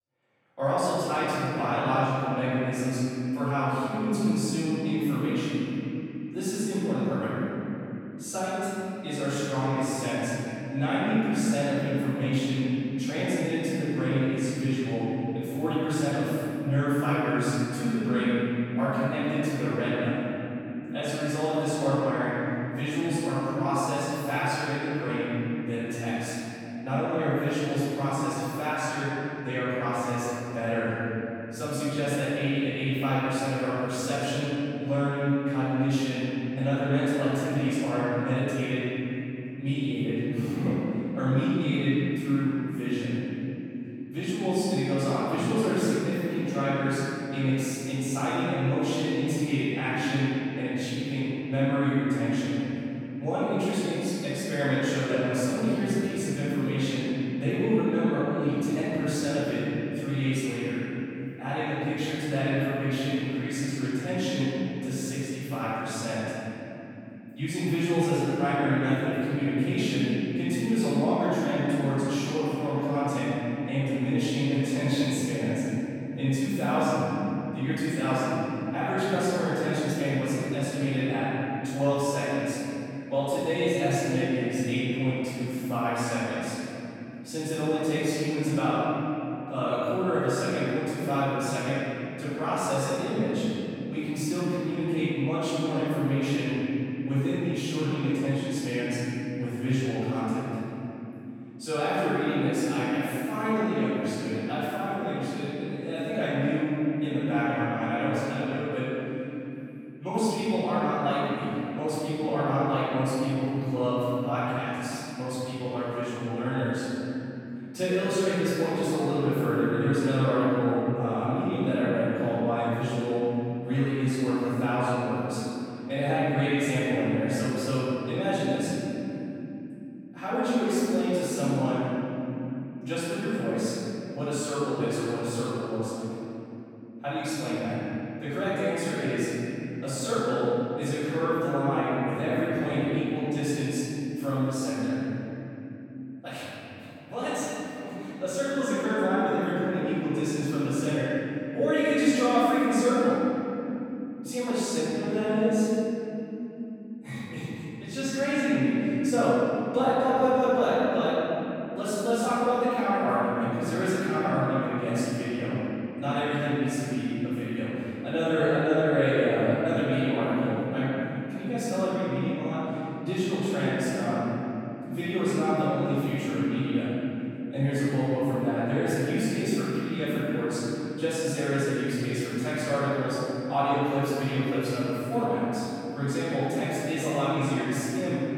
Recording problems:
room echo; strong; dies away in 3 s
off-mic speech; far

